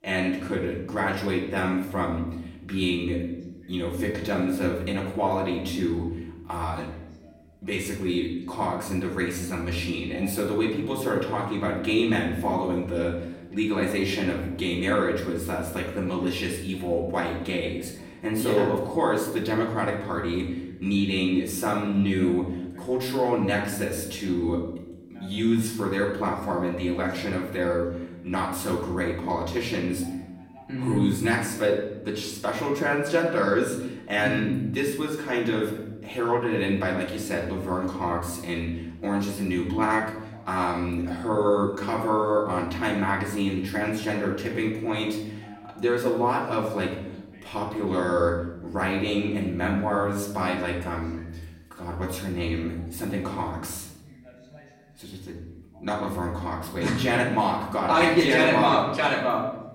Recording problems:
off-mic speech; far
room echo; noticeable; dies away in 0.8 s
voice in the background; faint; throughout; 30 dB below the speech

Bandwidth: 16 kHz